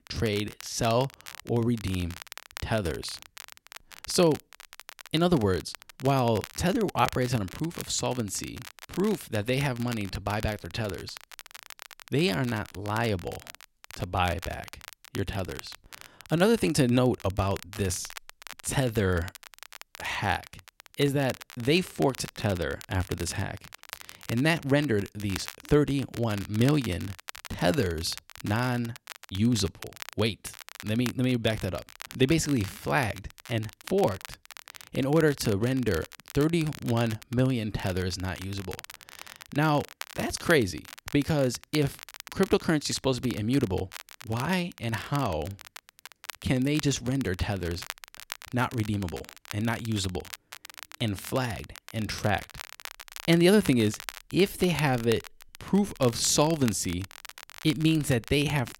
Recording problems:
crackle, like an old record; noticeable; 15 dB below the speech

